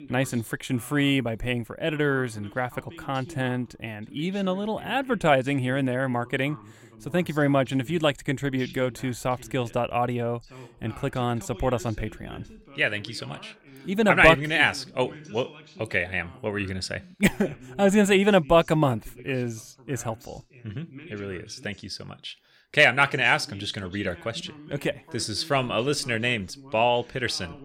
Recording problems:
voice in the background; faint; throughout; 20 dB below the speech

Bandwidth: 16.5 kHz